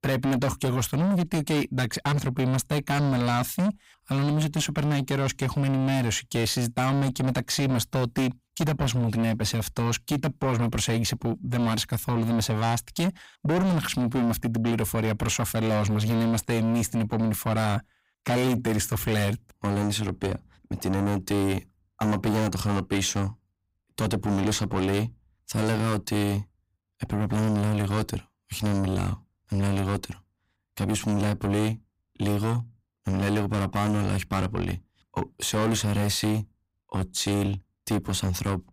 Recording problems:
distortion; heavy; 6 dB below the speech

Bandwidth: 15.5 kHz